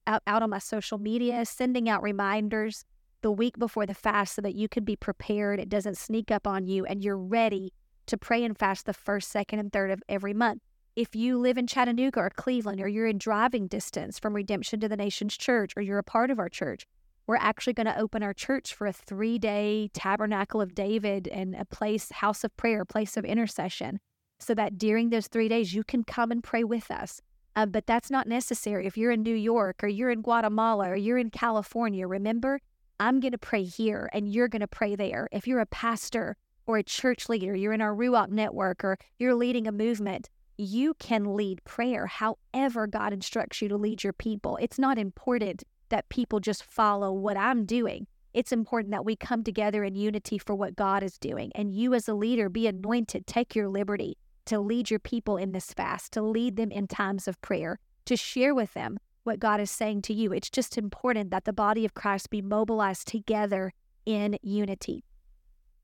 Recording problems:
none

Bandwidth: 17.5 kHz